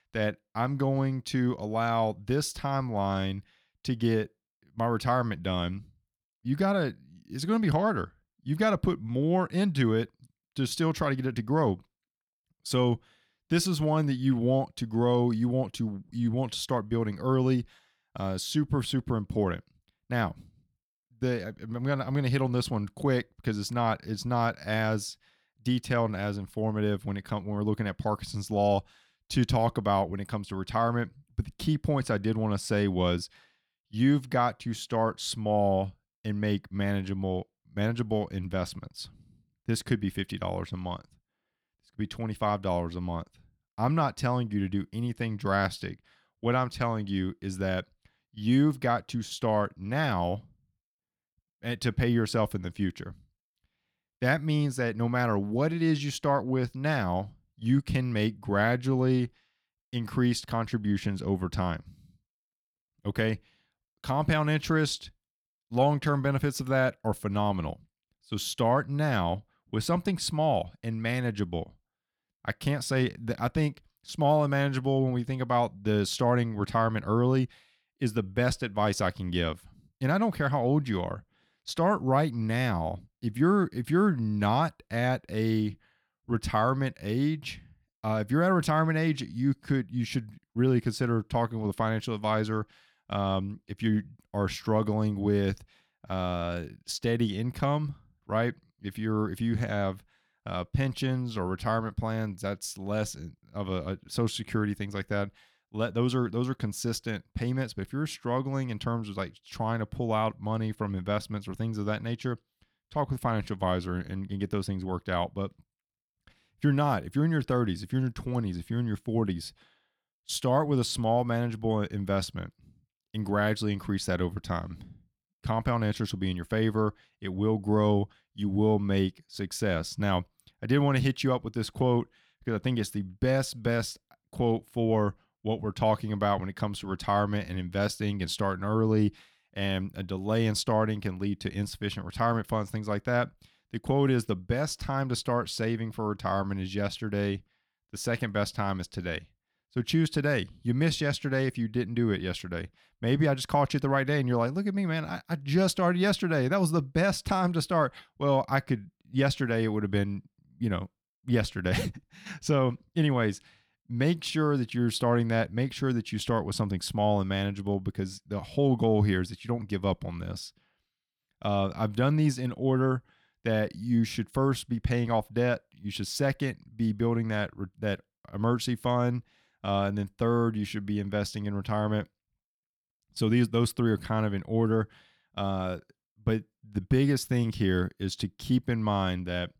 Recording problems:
none

